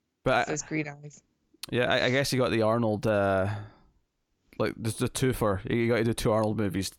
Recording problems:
none

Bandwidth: 17.5 kHz